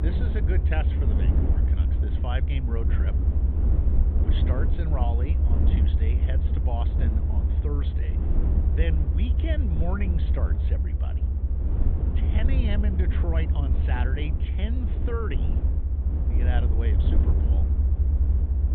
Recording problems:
high frequencies cut off; severe; nothing above 4 kHz
low rumble; loud; throughout; 2 dB below the speech

